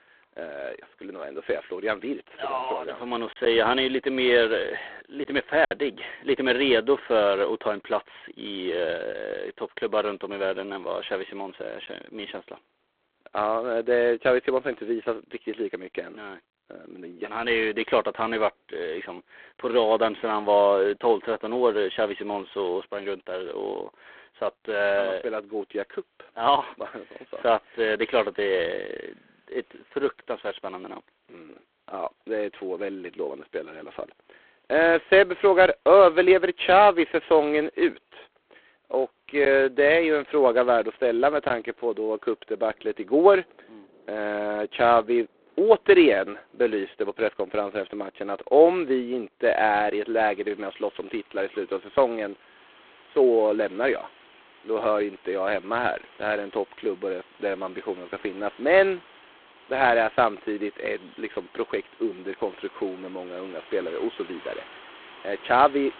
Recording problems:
phone-call audio; poor line
wind in the background; faint; throughout; 25 dB below the speech
choppy; occasionally; from 3.5 to 5.5 s; 2% of the speech affected

